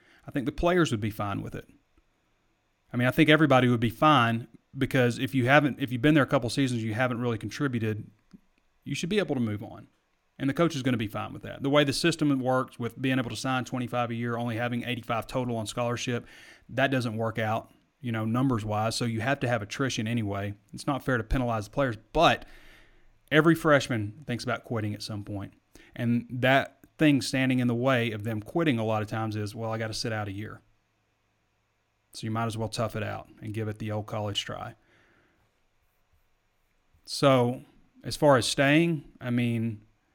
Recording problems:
none

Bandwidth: 17 kHz